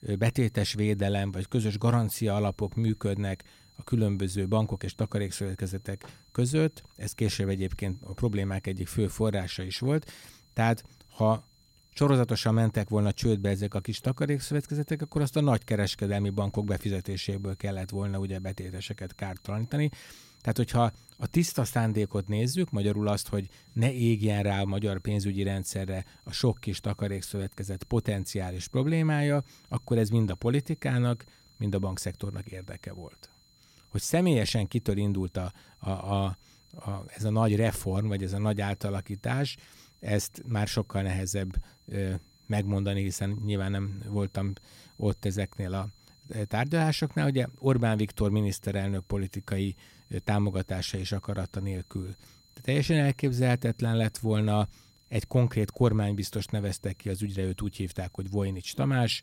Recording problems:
high-pitched whine; faint; throughout; 4 kHz, 30 dB below the speech

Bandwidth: 16 kHz